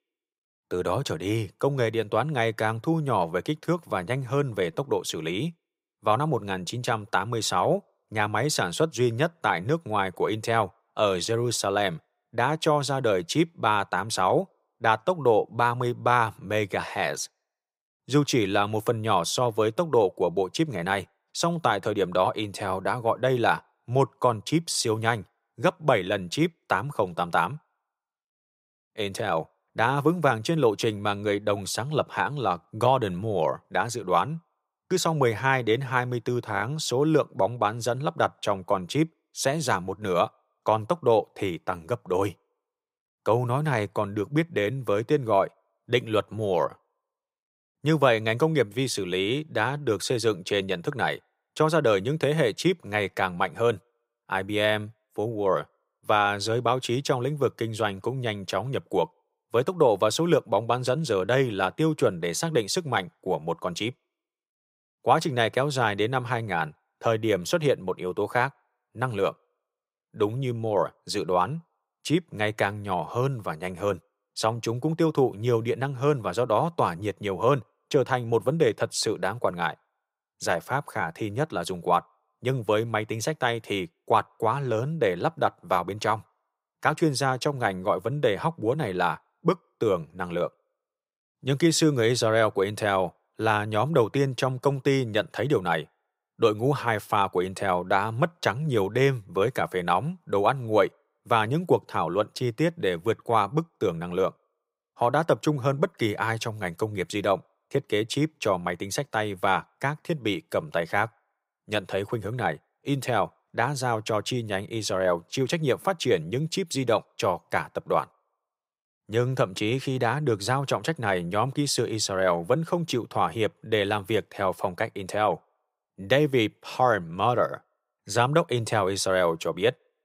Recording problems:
none

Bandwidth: 15.5 kHz